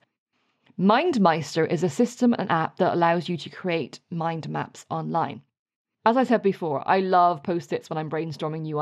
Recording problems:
muffled; slightly; fading above 3.5 kHz
abrupt cut into speech; at the end

